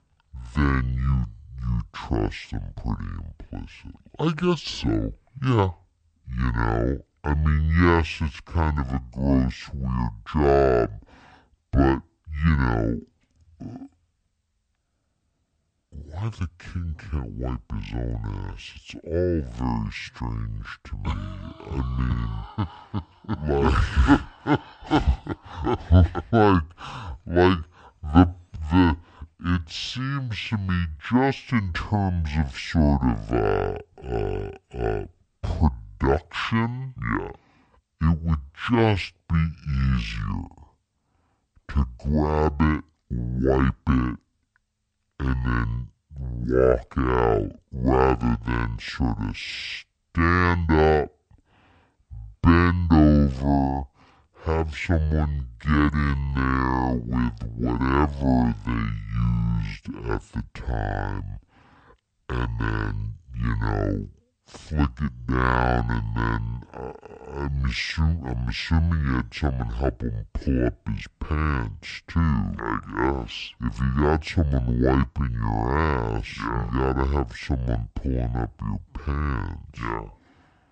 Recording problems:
wrong speed and pitch; too slow and too low; 0.6 times normal speed

